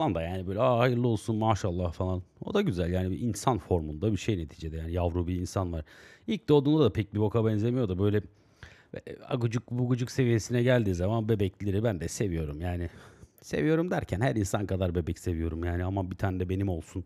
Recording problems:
abrupt cut into speech; at the start

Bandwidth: 14 kHz